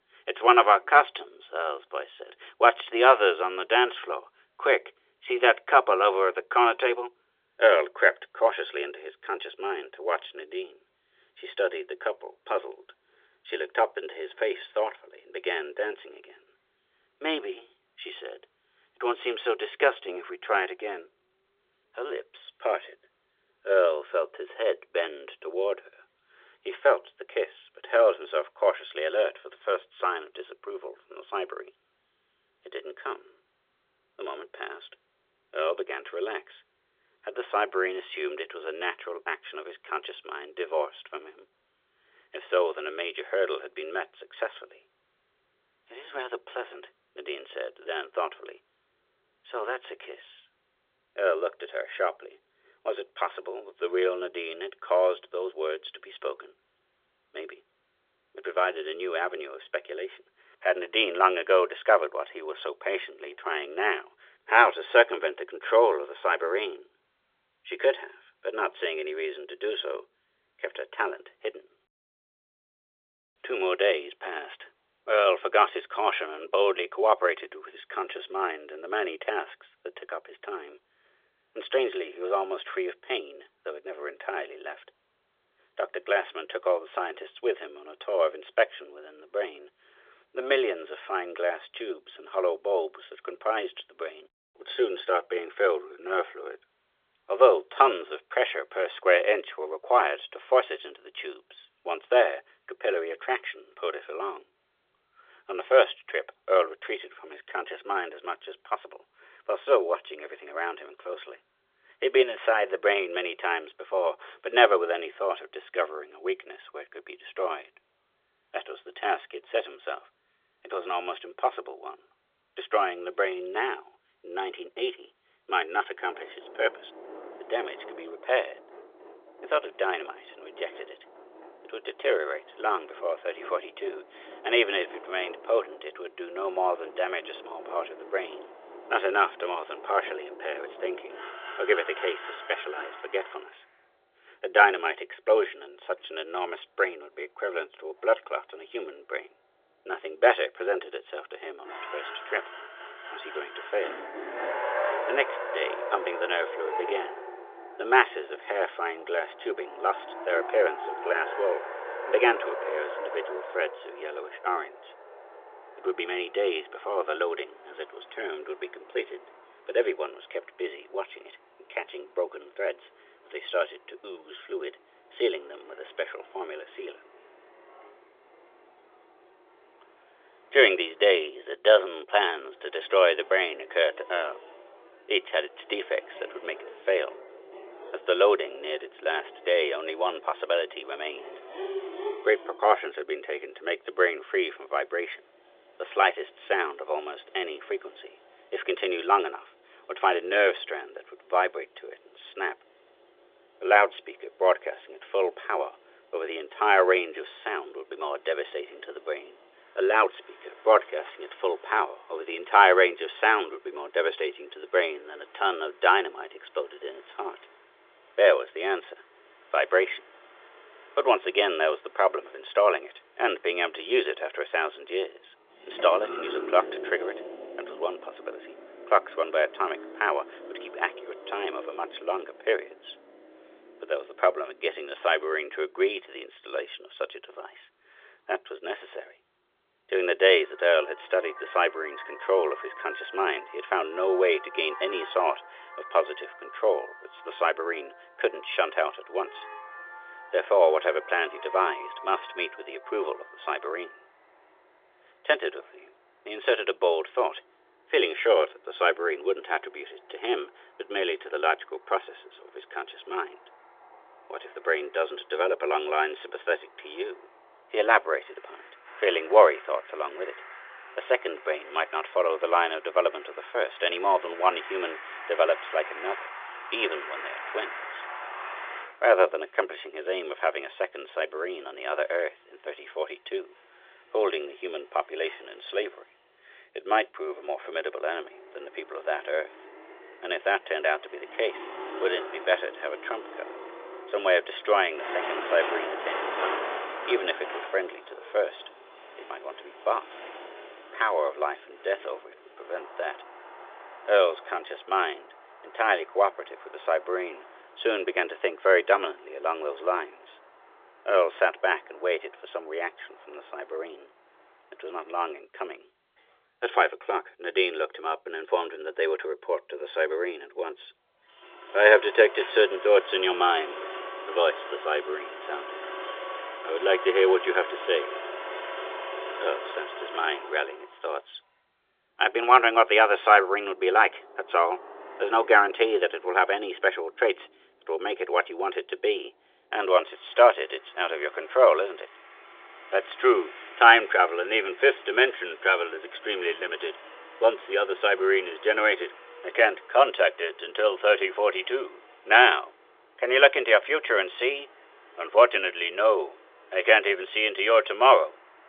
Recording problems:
phone-call audio; nothing above 3.5 kHz
traffic noise; noticeable; from 2:06 on; 15 dB below the speech

